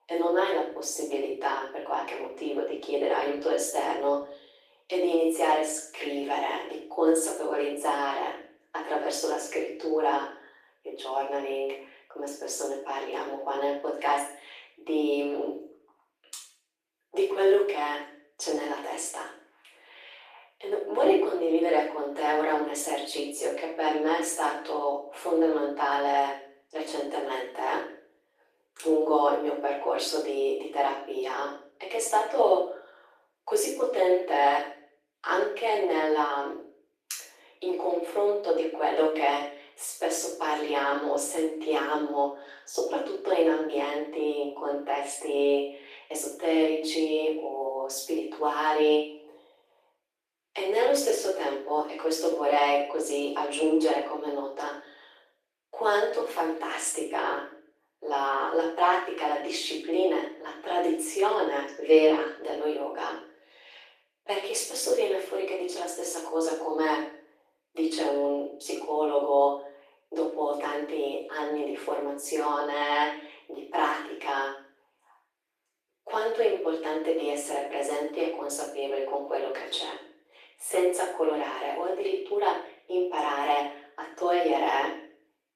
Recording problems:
off-mic speech; far
room echo; noticeable; dies away in 0.5 s
thin; somewhat; fading below 300 Hz
garbled, watery; slightly; nothing above 14.5 kHz

